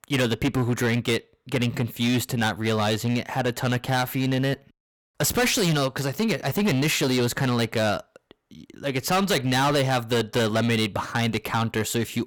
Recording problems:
distortion; heavy; 14% of the sound clipped

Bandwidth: 18.5 kHz